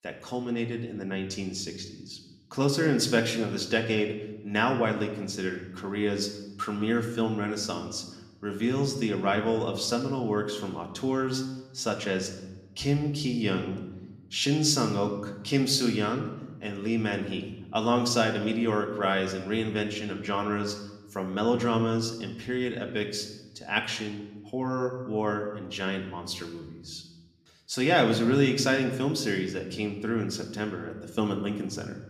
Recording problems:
room echo; slight; dies away in 0.8 s
off-mic speech; somewhat distant

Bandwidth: 14.5 kHz